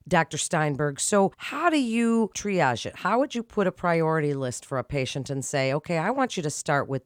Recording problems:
none

